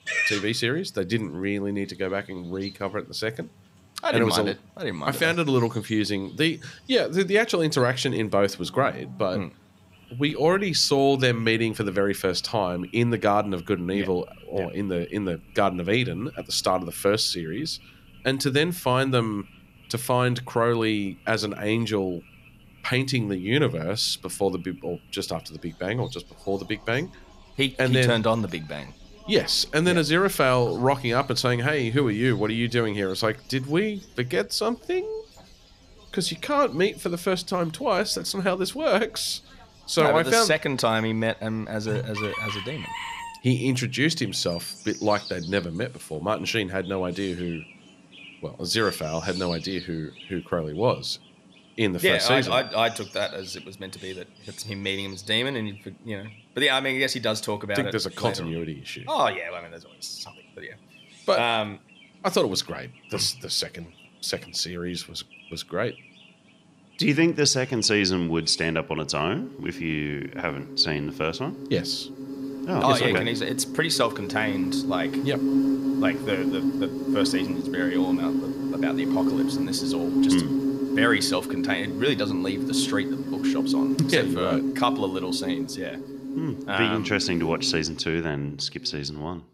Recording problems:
animal sounds; loud; throughout; 4 dB below the speech

